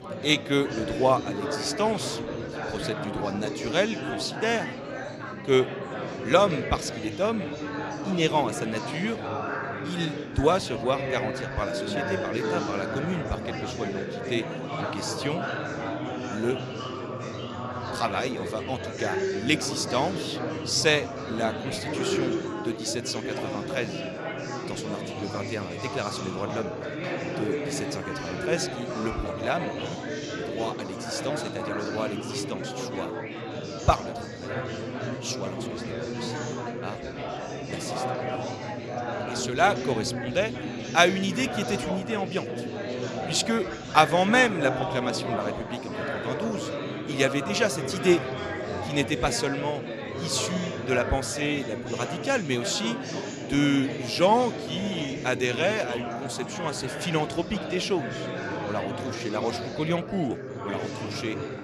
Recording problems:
chatter from many people; loud; throughout; 4 dB below the speech

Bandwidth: 15 kHz